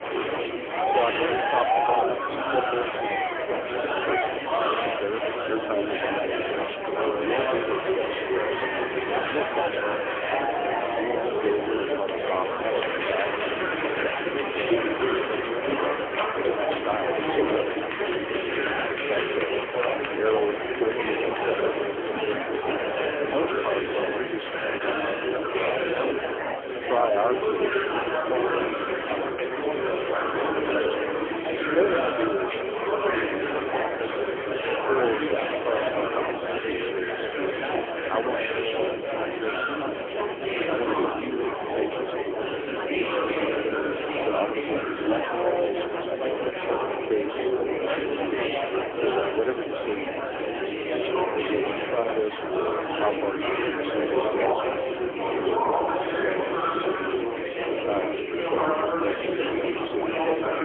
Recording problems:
phone-call audio; poor line; nothing above 3.5 kHz
murmuring crowd; very loud; throughout; 5 dB above the speech
wind in the background; very faint; until 40 s; 25 dB below the speech
choppy; occasionally; at 25 s; 2% of the speech affected

